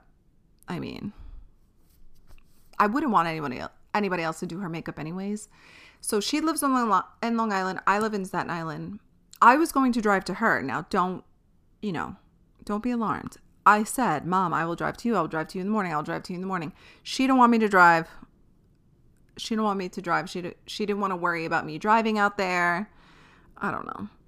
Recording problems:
none

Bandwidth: 15 kHz